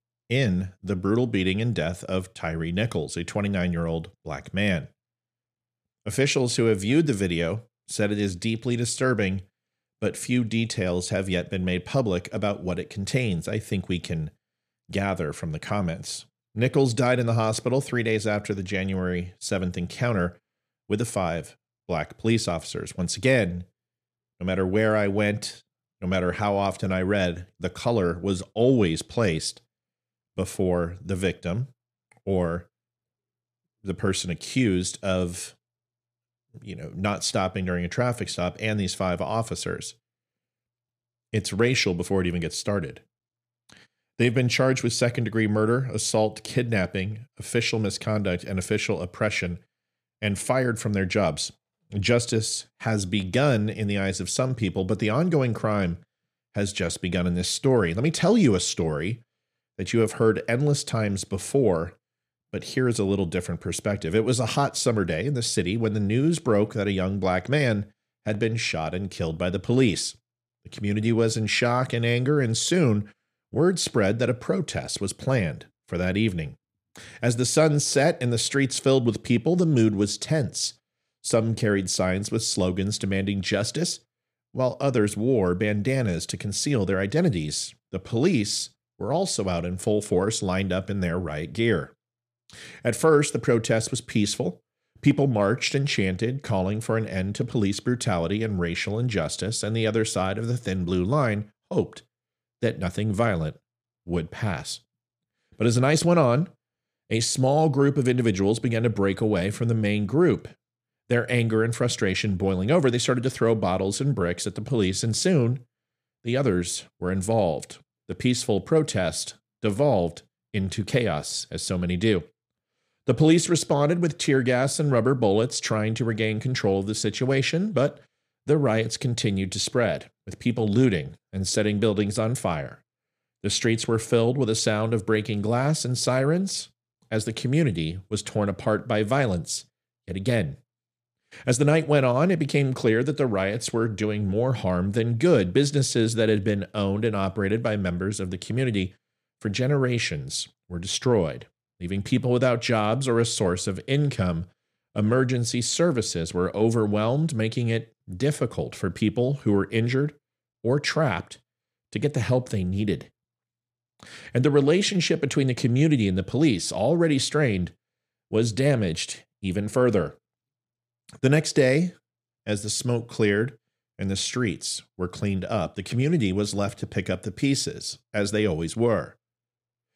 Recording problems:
none

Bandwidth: 14.5 kHz